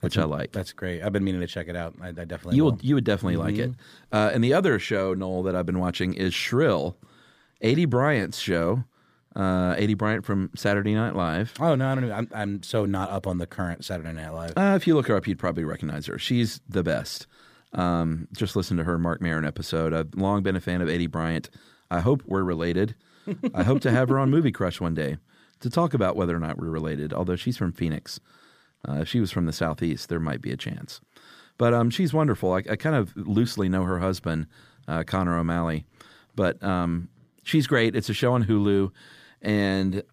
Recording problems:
none

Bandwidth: 15 kHz